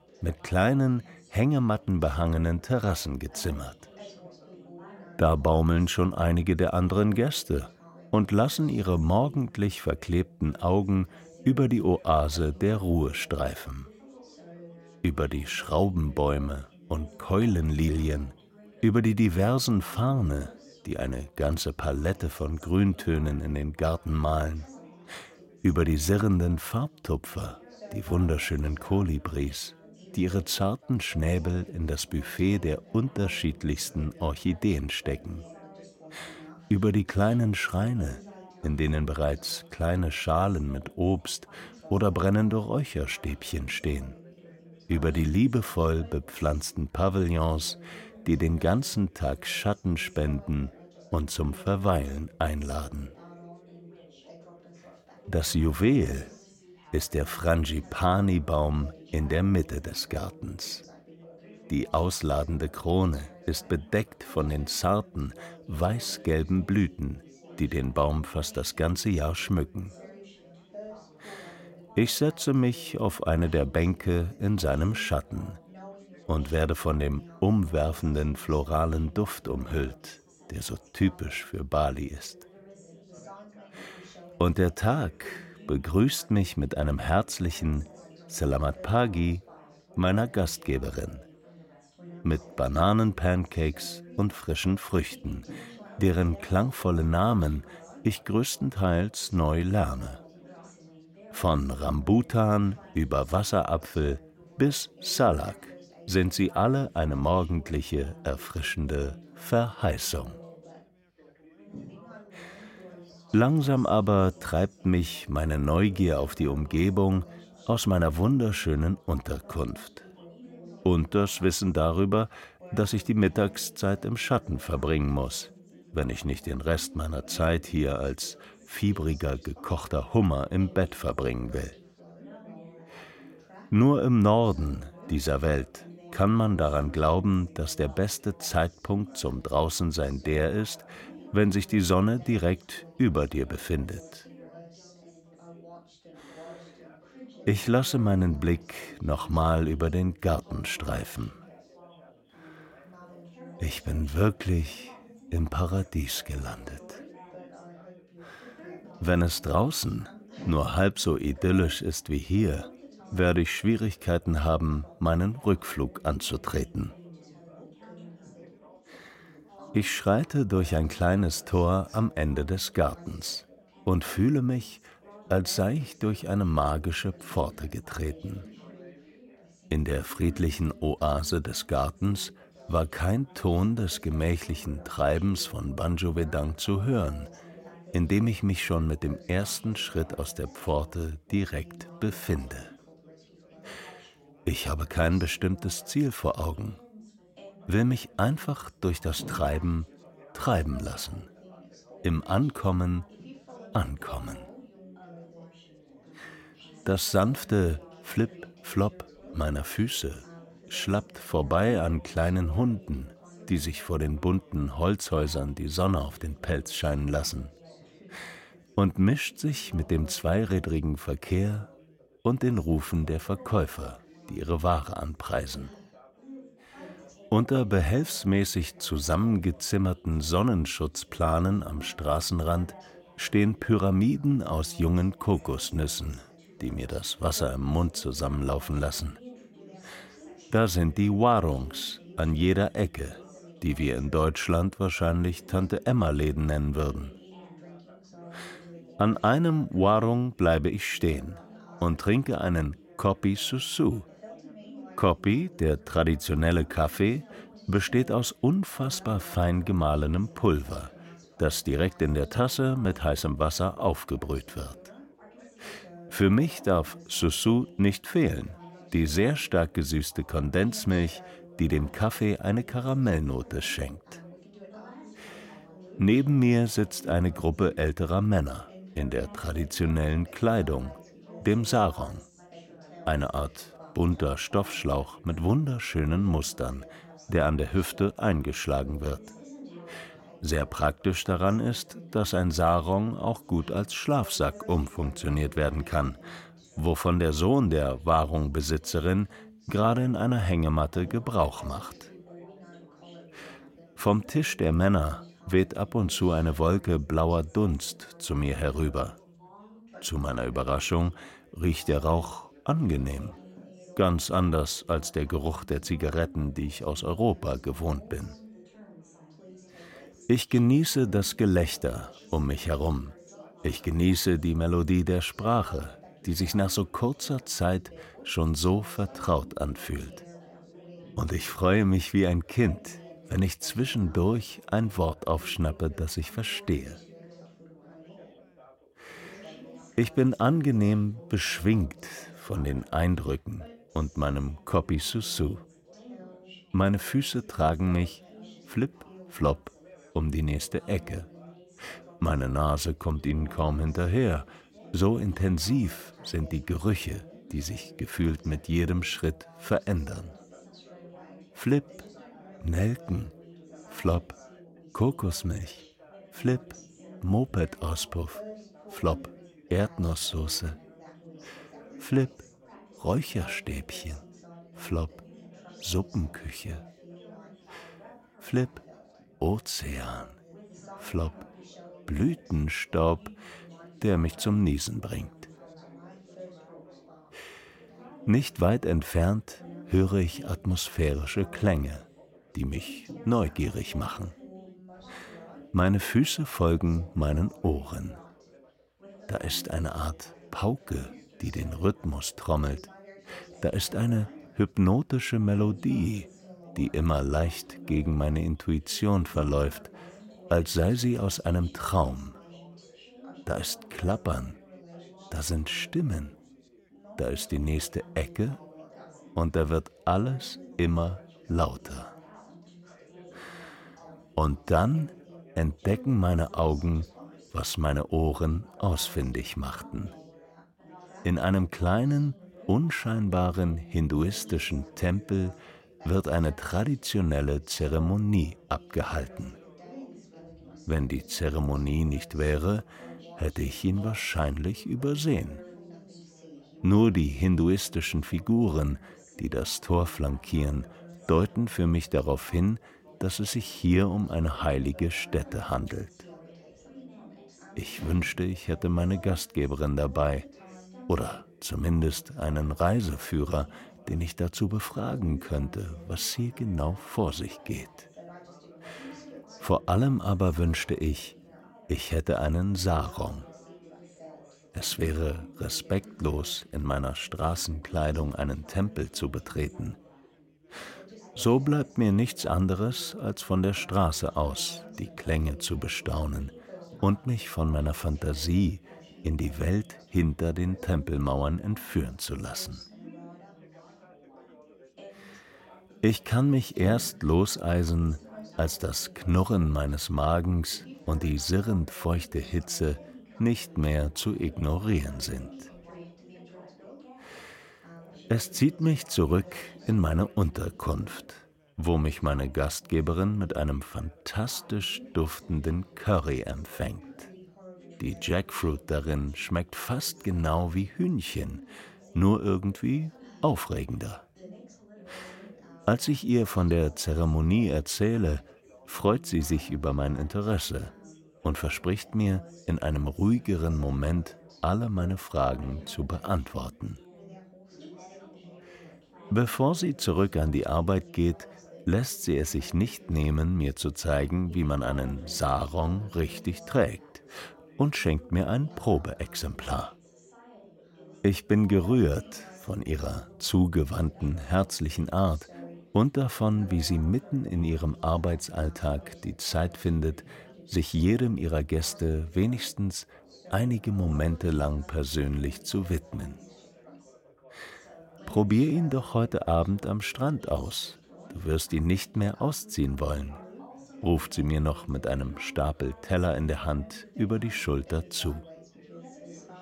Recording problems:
background chatter; faint; throughout; 4 voices, 20 dB below the speech

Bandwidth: 16.5 kHz